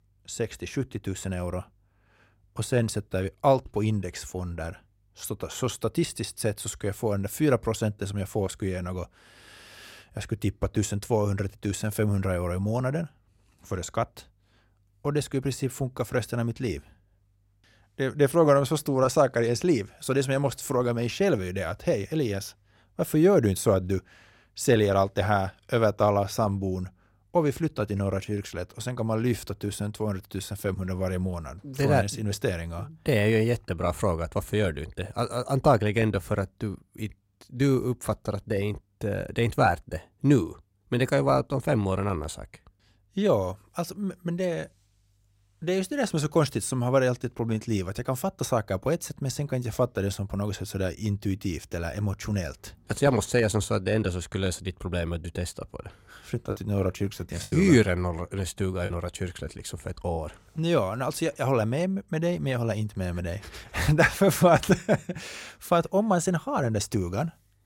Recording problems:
choppy; occasionally; from 57 to 59 s; 3% of the speech affected

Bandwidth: 16.5 kHz